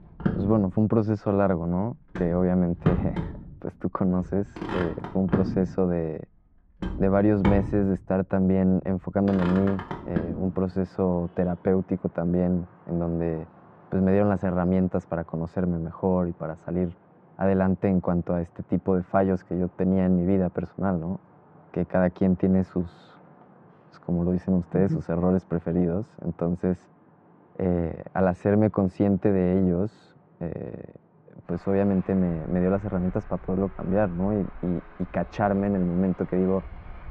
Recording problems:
muffled; very; fading above 1.5 kHz
traffic noise; loud; throughout; 9 dB below the speech

